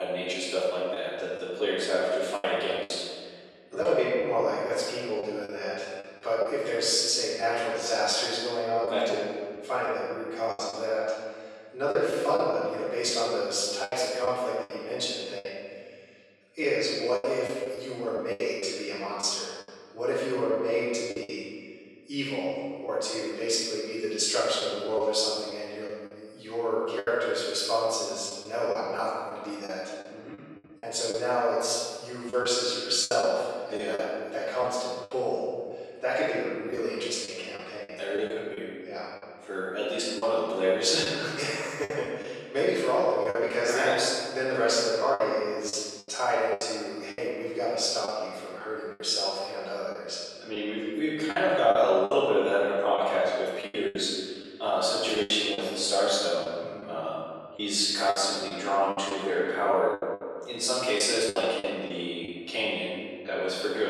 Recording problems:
room echo; strong; dies away in 1.7 s
off-mic speech; far
thin; very; fading below 500 Hz
choppy; very; 7% of the speech affected
abrupt cut into speech; at the start and the end

